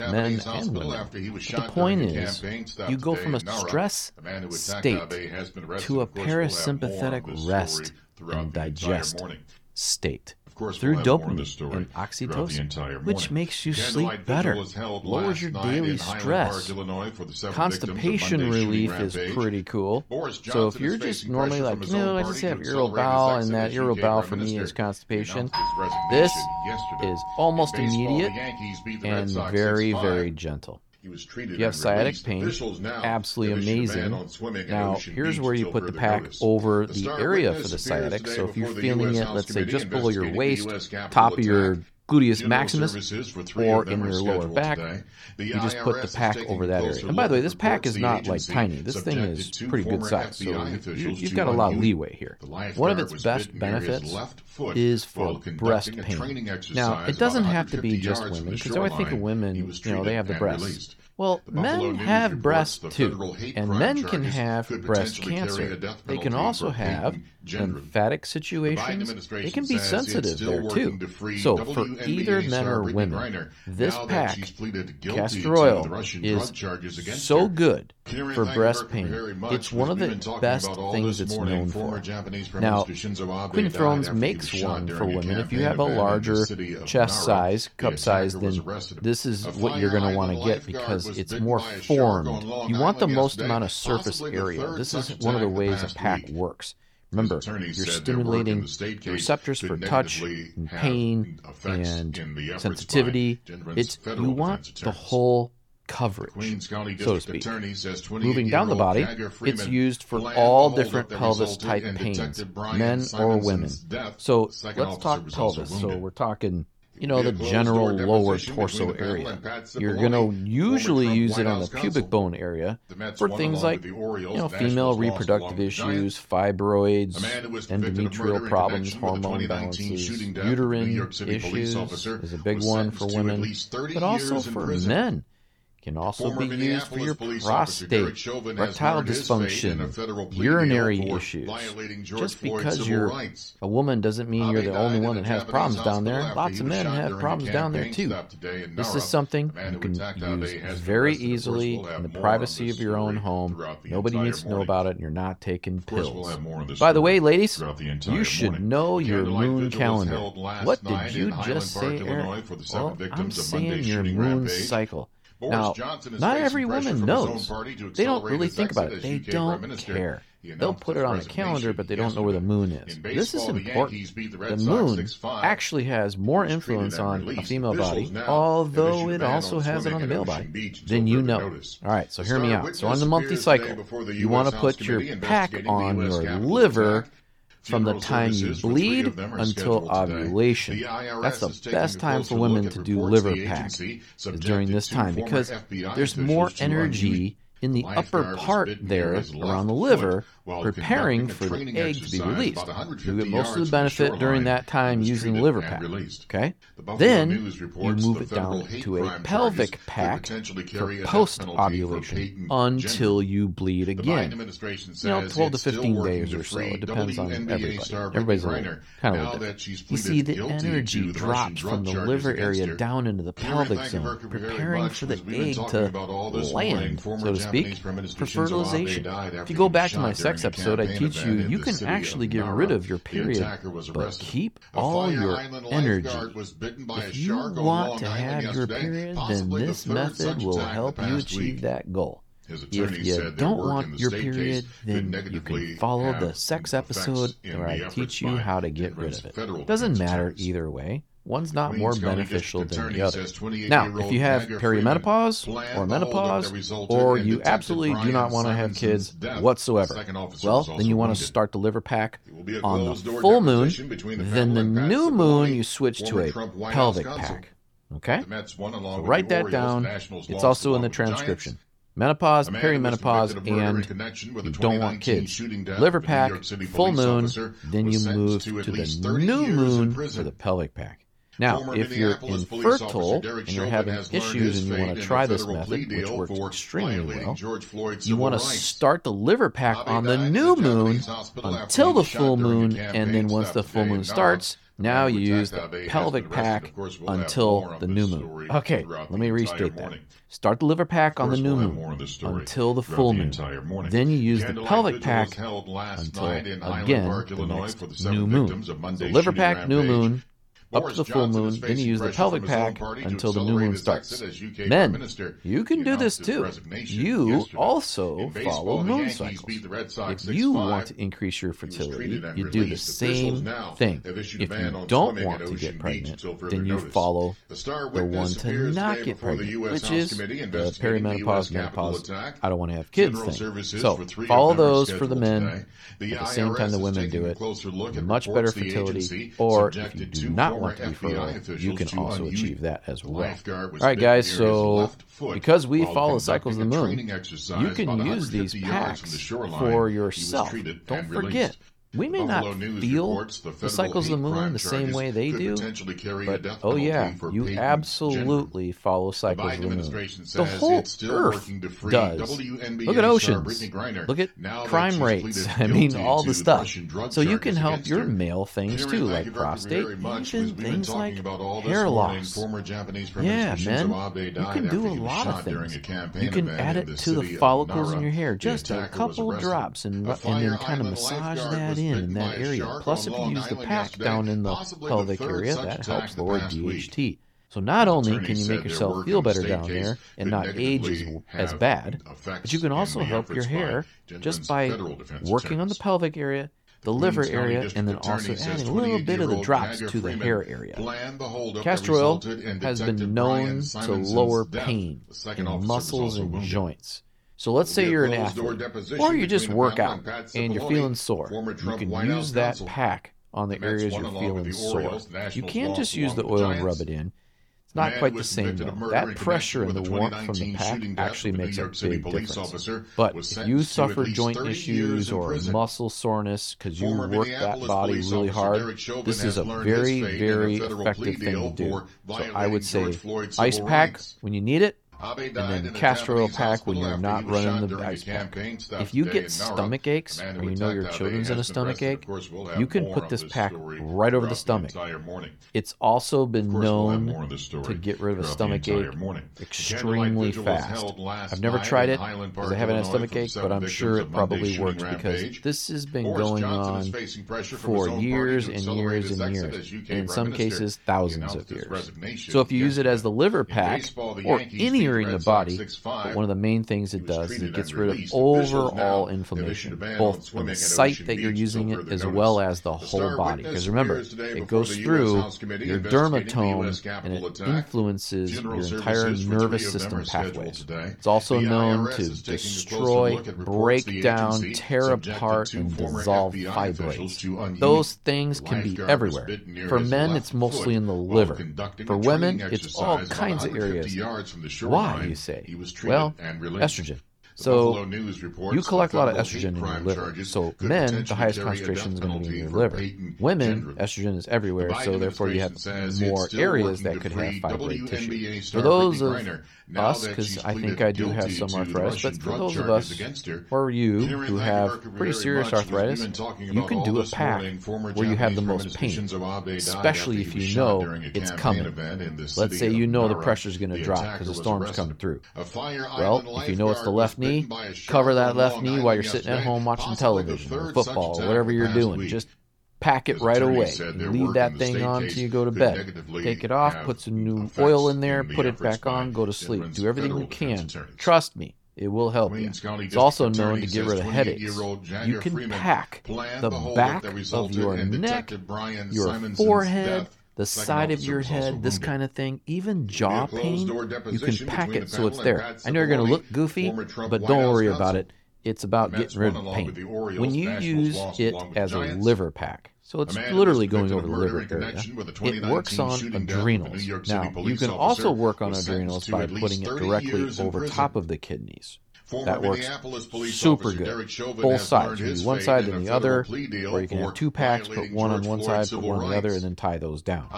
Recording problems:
voice in the background; loud; throughout; 7 dB below the speech
doorbell; noticeable; from 26 to 29 s; peak level with the speech

